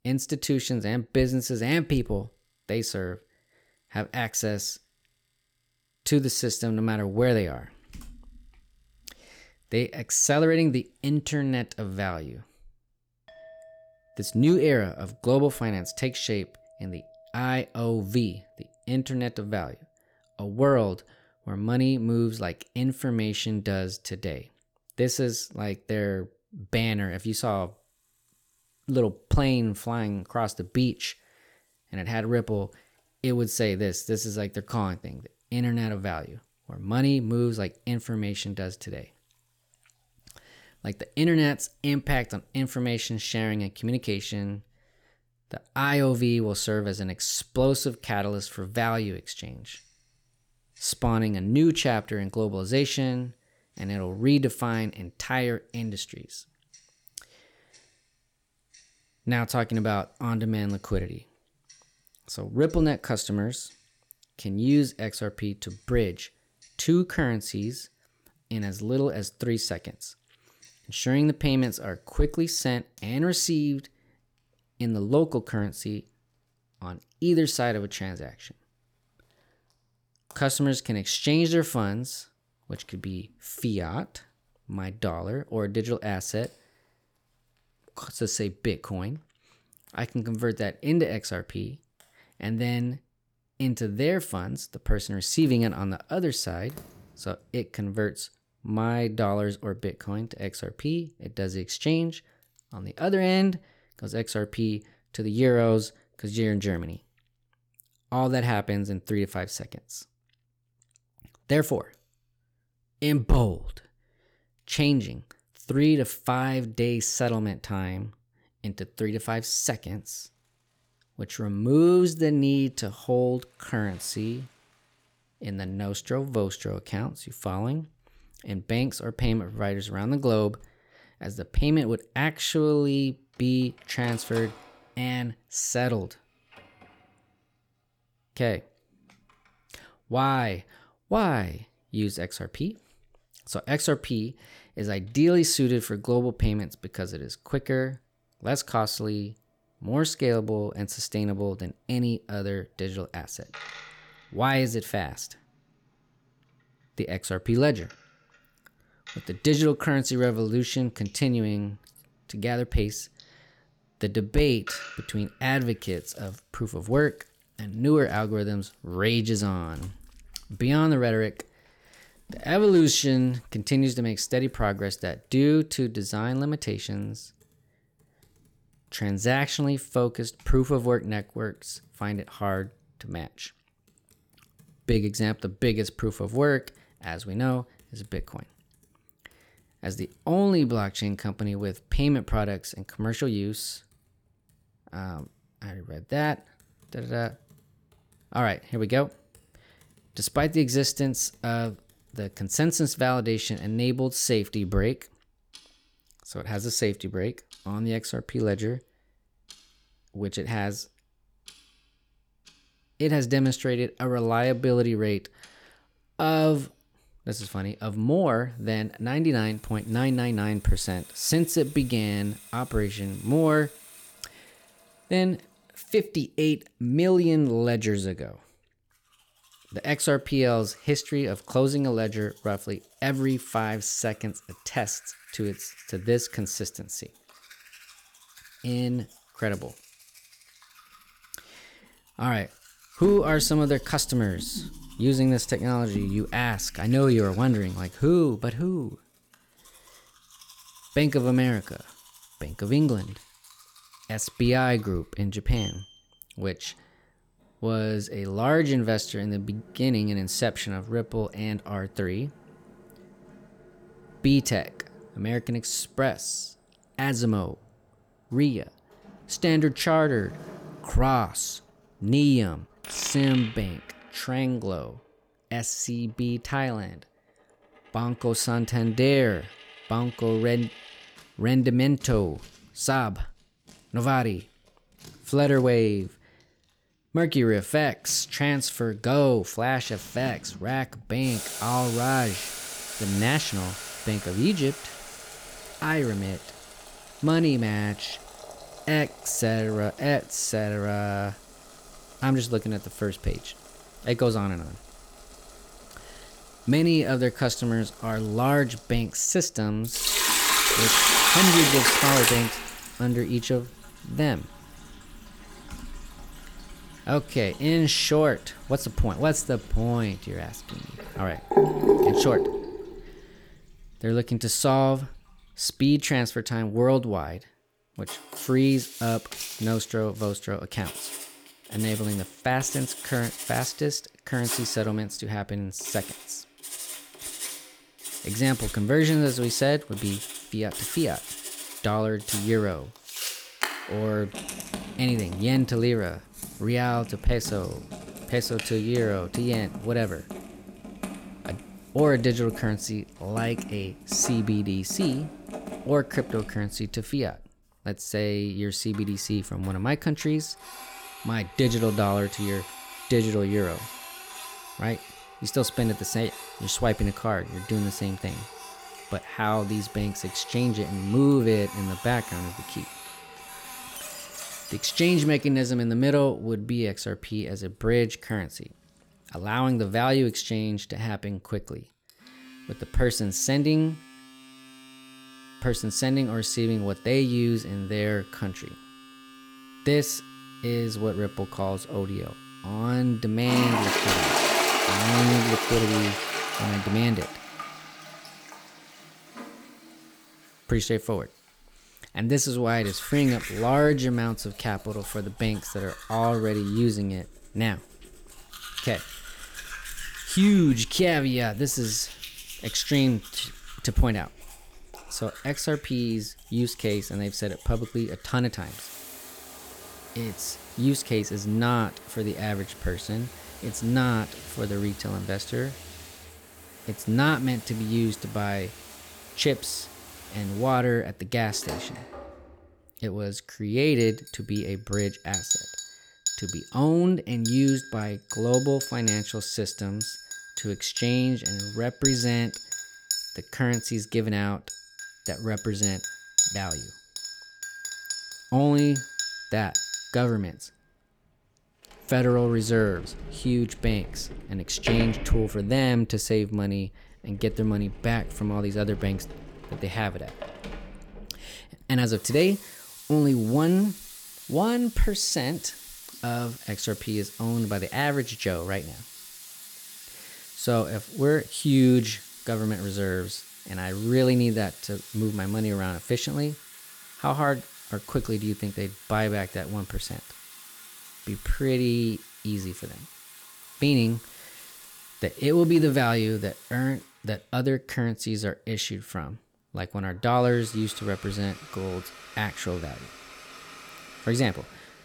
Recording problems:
household noises; loud; throughout; 6 dB below the speech

